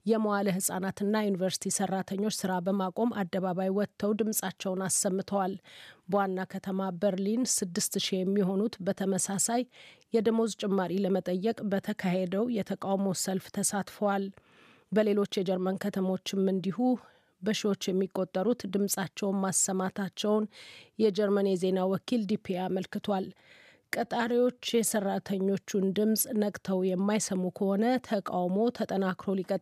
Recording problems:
uneven, jittery; strongly; from 2 to 25 s

